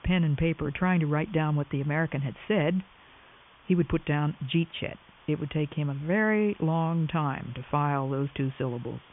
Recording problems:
high frequencies cut off; severe; nothing above 3.5 kHz
hiss; faint; throughout; 25 dB below the speech

